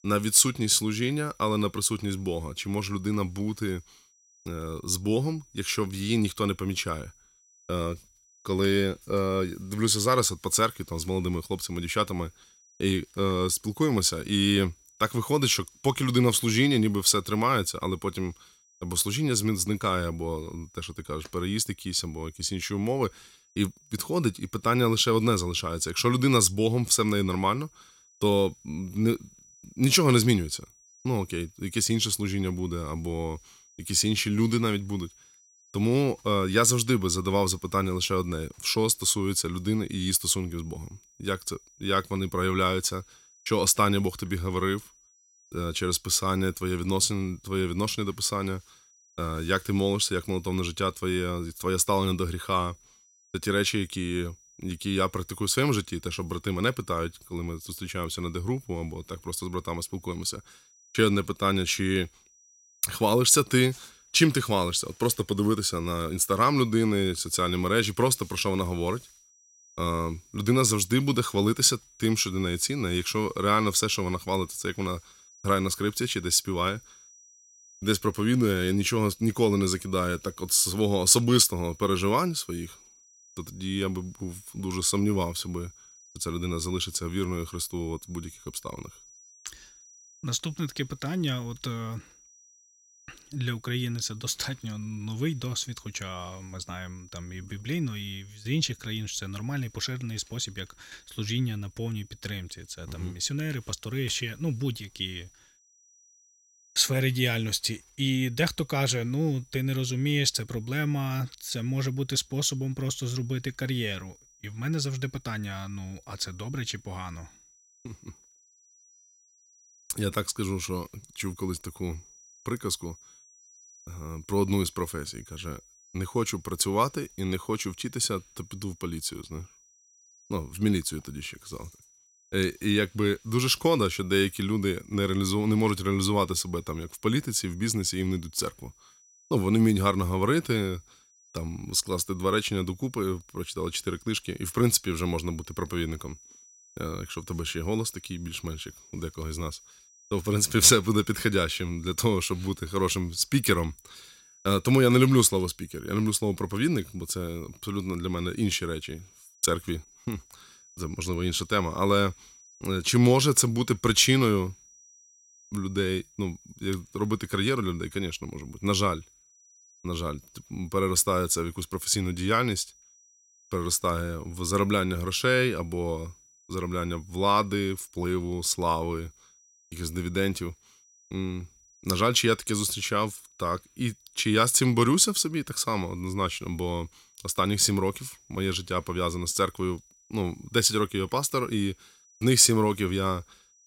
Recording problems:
high-pitched whine; faint; throughout; 6 kHz, 30 dB below the speech

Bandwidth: 16 kHz